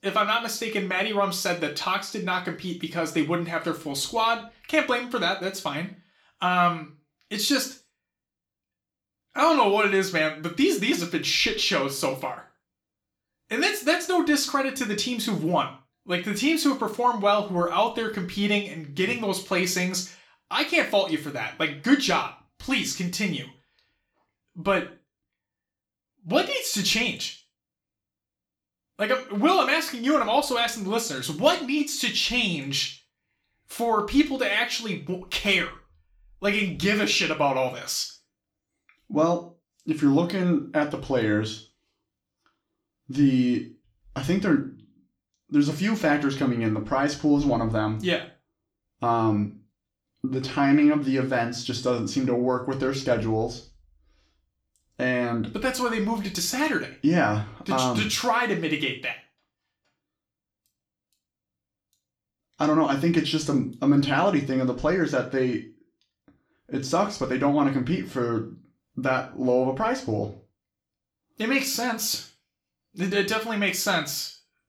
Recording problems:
room echo; slight; dies away in 0.3 s
off-mic speech; somewhat distant

